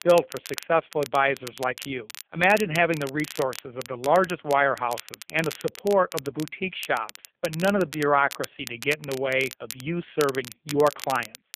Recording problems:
phone-call audio; poor line; nothing above 3.5 kHz
crackle, like an old record; noticeable; 15 dB below the speech

